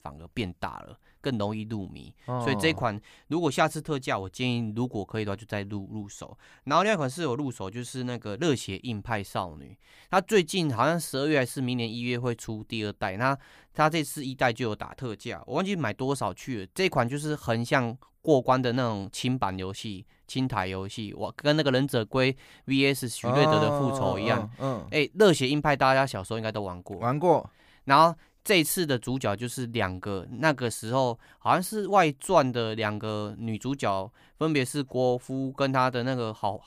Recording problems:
none

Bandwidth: 15 kHz